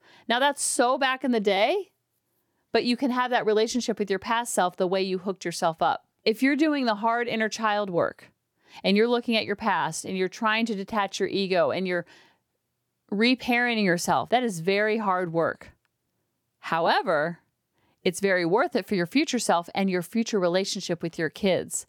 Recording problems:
none

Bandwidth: 19 kHz